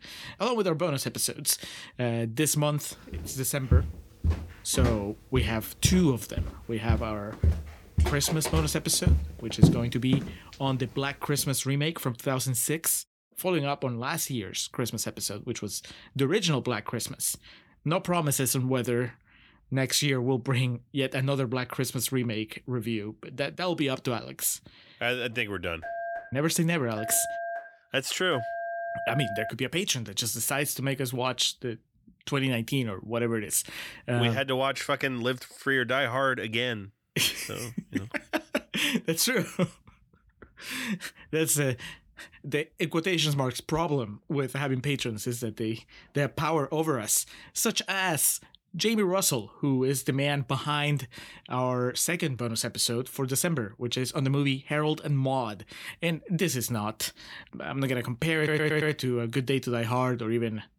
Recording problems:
footsteps; loud; from 3.5 to 10 s; peak 6 dB above the speech
phone ringing; noticeable; from 26 to 30 s; peak 5 dB below the speech
audio stuttering; at 58 s

